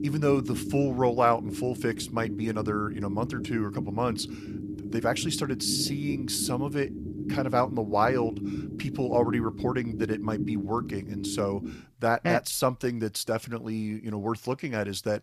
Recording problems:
low rumble; noticeable; until 12 s; 10 dB below the speech

